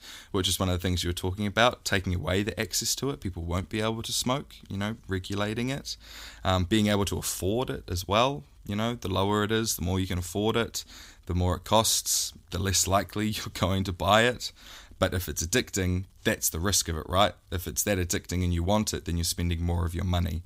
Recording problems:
none

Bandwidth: 15.5 kHz